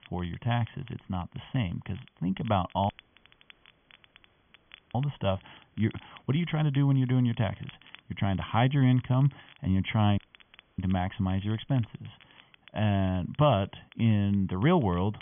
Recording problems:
high frequencies cut off; severe; nothing above 3.5 kHz
crackle, like an old record; faint; 25 dB below the speech
hiss; very faint; throughout; 40 dB below the speech
audio cutting out; at 3 s for 2 s and at 10 s for 0.5 s

